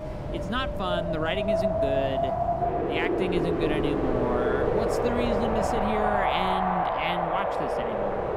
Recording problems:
wind in the background; very loud; throughout; 5 dB above the speech

